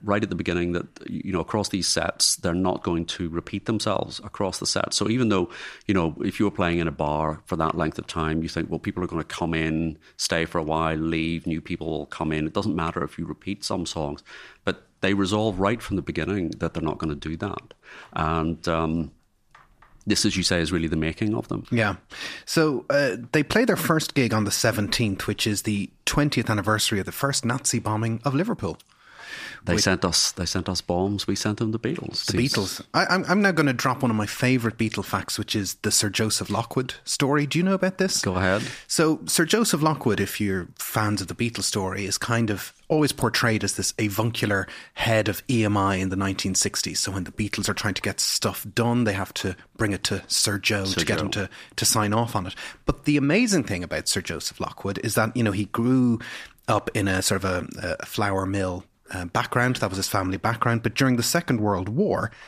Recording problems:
none

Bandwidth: 14.5 kHz